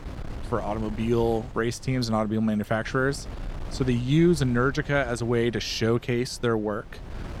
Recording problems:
wind noise on the microphone; occasional gusts; 20 dB below the speech

